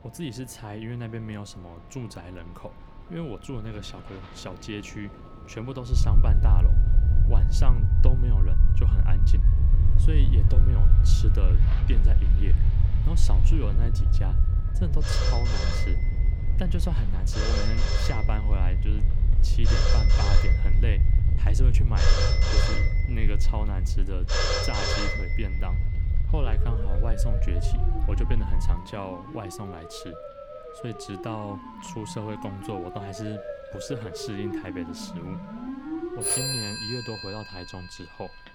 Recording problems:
alarms or sirens; very loud; throughout; 3 dB above the speech
low rumble; loud; from 6 to 29 s; 4 dB below the speech
rain or running water; noticeable; throughout; 15 dB below the speech
wind noise on the microphone; occasional gusts; until 29 s; 15 dB below the speech

